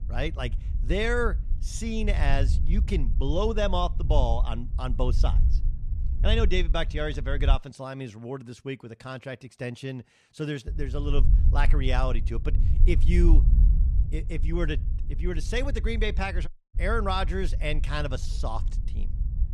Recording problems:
wind noise on the microphone; occasional gusts; until 7.5 s and from 11 s on; 15 dB below the speech
audio cutting out; at 16 s

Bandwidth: 13.5 kHz